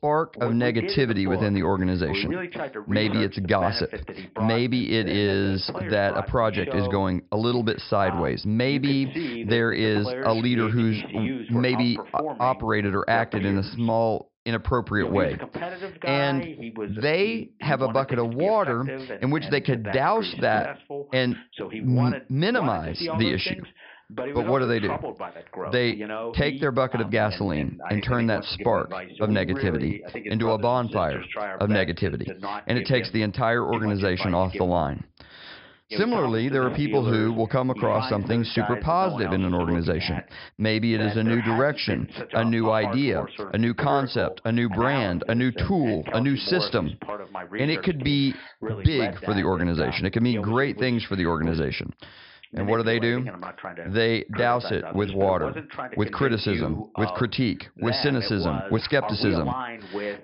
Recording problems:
high frequencies cut off; noticeable; nothing above 5.5 kHz
voice in the background; loud; throughout; 10 dB below the speech

